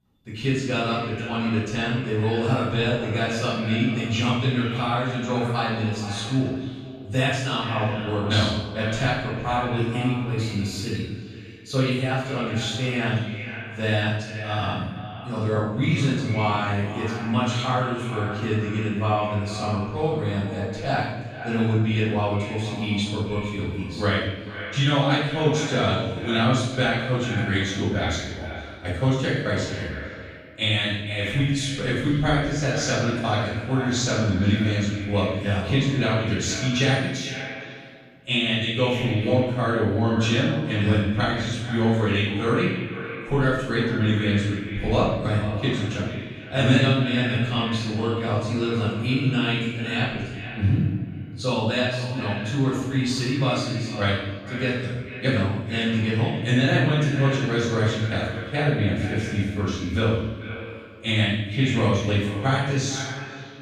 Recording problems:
echo of what is said; strong; throughout; 440 ms later, 10 dB below the speech
room echo; strong; dies away in 0.9 s
off-mic speech; far

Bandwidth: 14.5 kHz